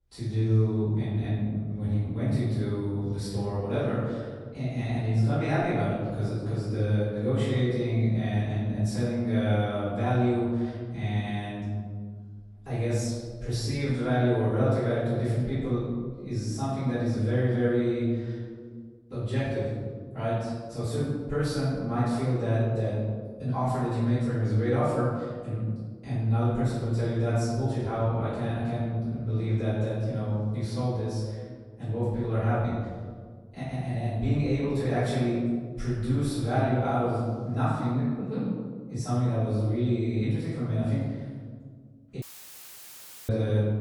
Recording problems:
room echo; strong; dies away in 1.6 s
off-mic speech; far
audio cutting out; filled with static; at 42 s for 1 s

